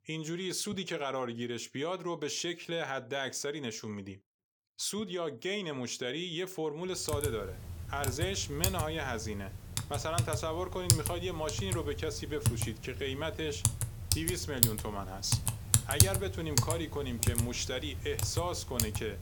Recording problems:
household noises; very loud; from 7 s on; 3 dB above the speech

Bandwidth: 18 kHz